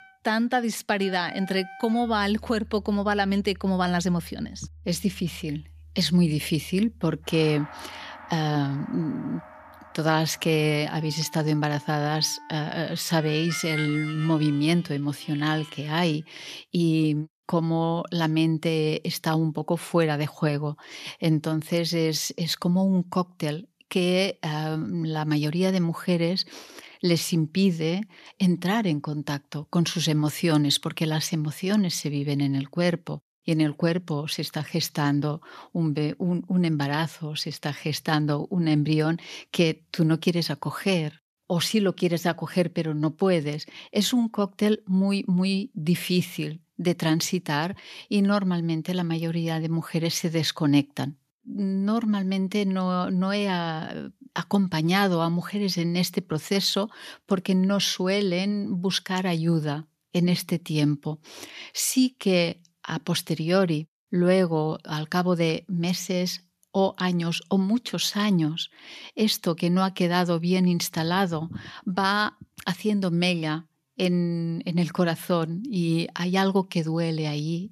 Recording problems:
background music; noticeable; until 16 s; 15 dB below the speech

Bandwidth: 14.5 kHz